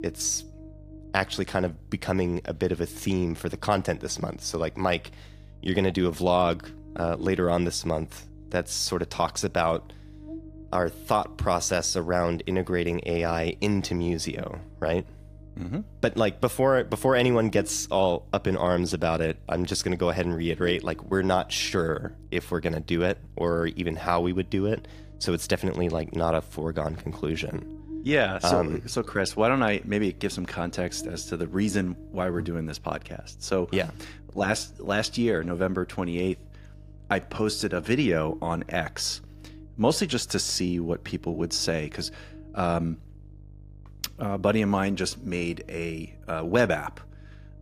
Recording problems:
electrical hum; faint; throughout; 50 Hz, 25 dB below the speech

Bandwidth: 15 kHz